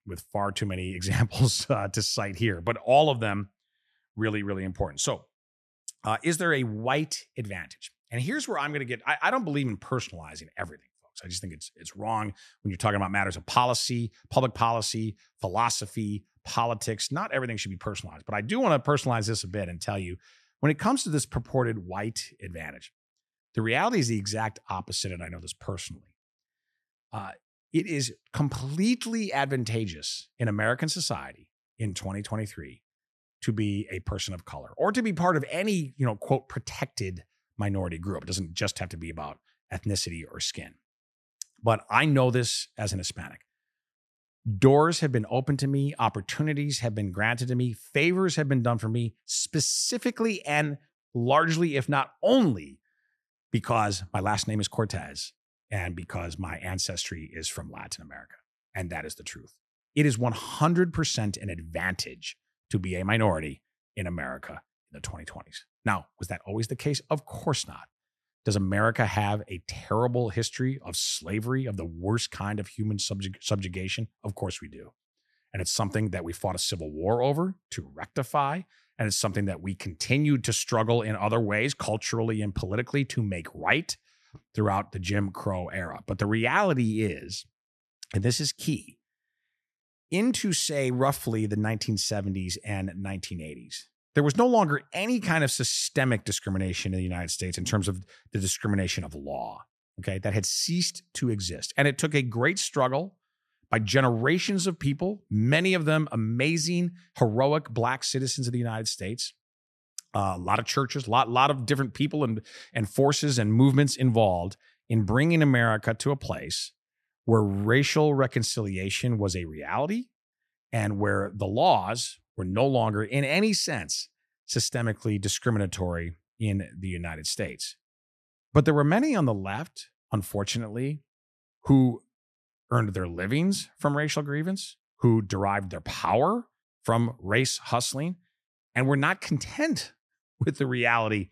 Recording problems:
none

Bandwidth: 13.5 kHz